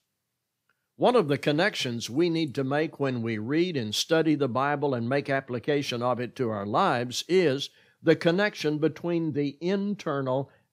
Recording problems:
none

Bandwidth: 15.5 kHz